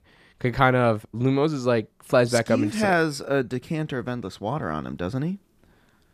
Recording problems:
none

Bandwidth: 14.5 kHz